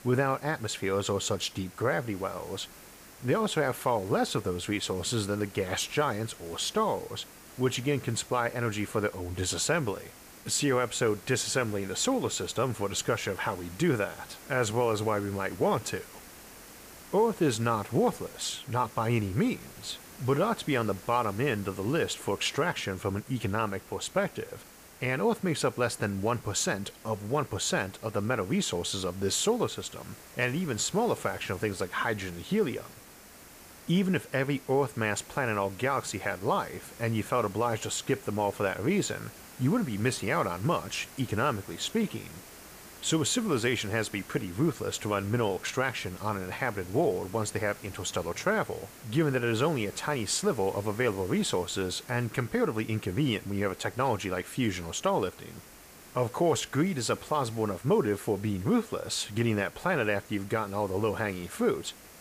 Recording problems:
hiss; noticeable; throughout; 20 dB below the speech

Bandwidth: 15 kHz